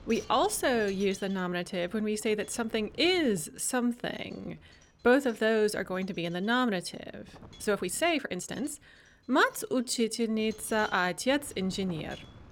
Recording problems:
wind noise on the microphone; occasional gusts; 25 dB below the speech
uneven, jittery; strongly; from 3.5 to 11 s

